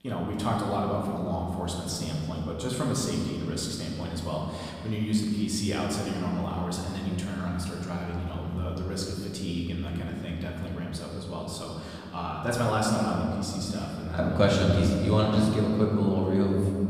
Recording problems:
off-mic speech; far
room echo; noticeable; dies away in 2.5 s

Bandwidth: 15 kHz